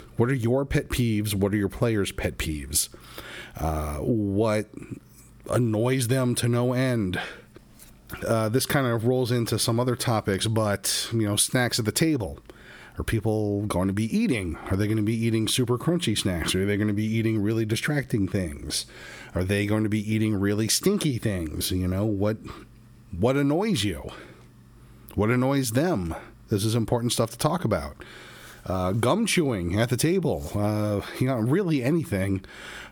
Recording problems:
squashed, flat; heavily

